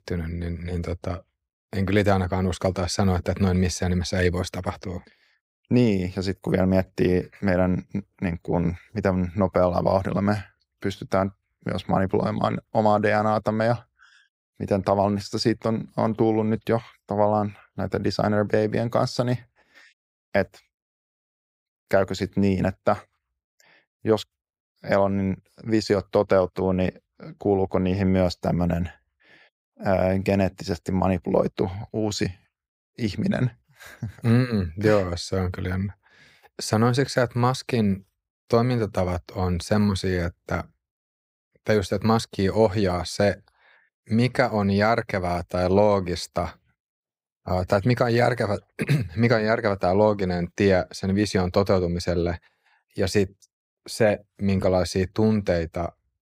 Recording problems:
none

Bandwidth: 15.5 kHz